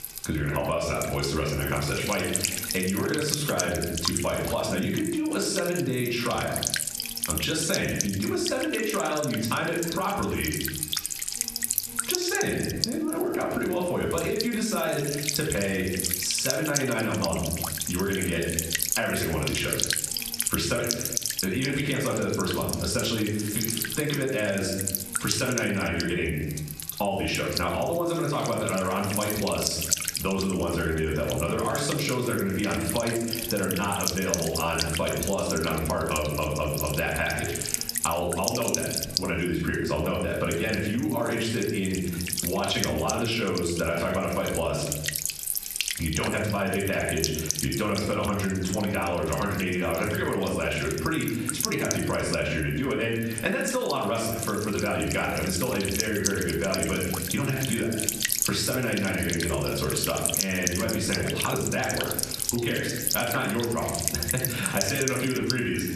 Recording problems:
off-mic speech; far
room echo; noticeable; dies away in 0.6 s
squashed, flat; somewhat
electrical hum; loud; throughout; 60 Hz, 4 dB below the speech

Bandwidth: 13.5 kHz